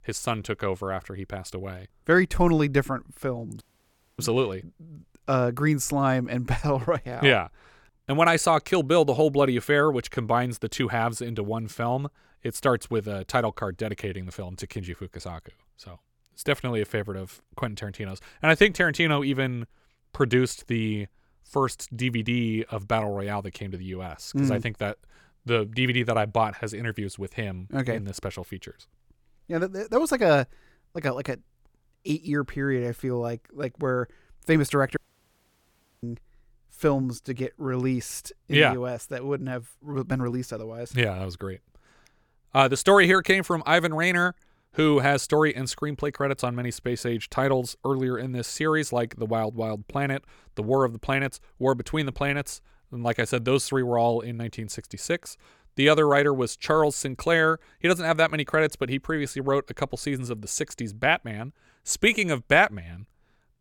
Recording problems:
audio cutting out; at 3.5 s for 0.5 s and at 35 s for 1 s

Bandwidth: 18 kHz